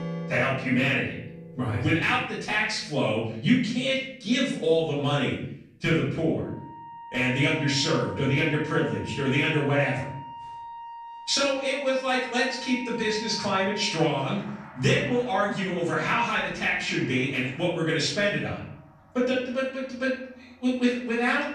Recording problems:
off-mic speech; far
room echo; noticeable; dies away in 0.7 s
background music; noticeable; throughout; 15 dB below the speech

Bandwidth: 15 kHz